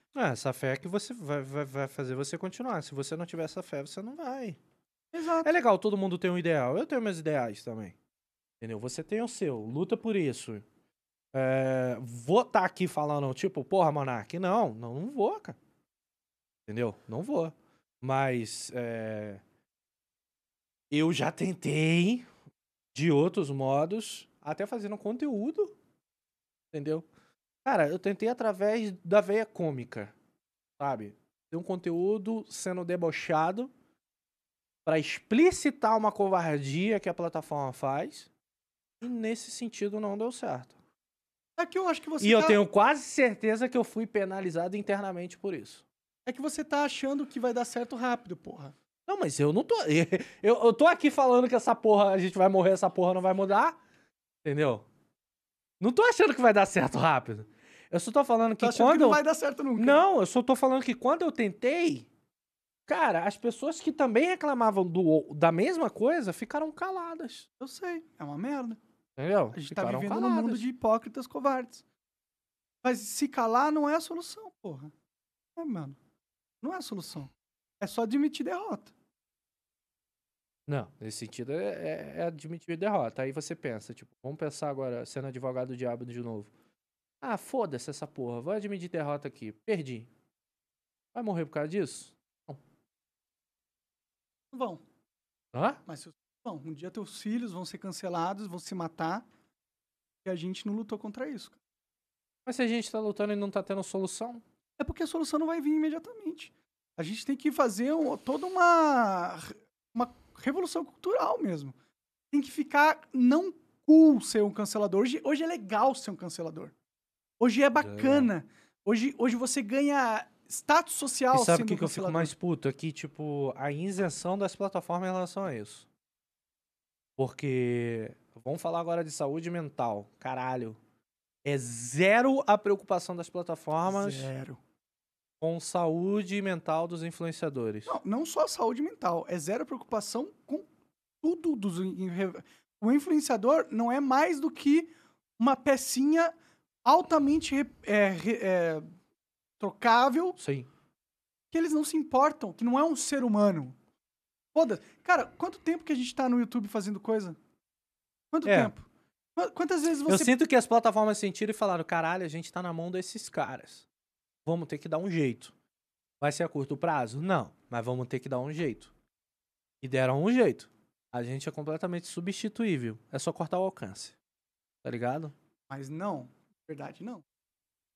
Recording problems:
none

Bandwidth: 13.5 kHz